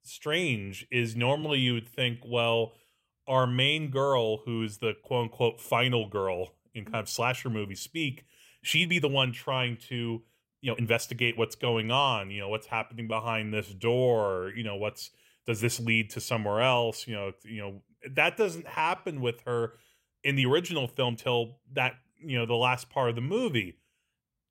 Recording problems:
uneven, jittery; strongly; from 1.5 to 24 s

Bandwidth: 16 kHz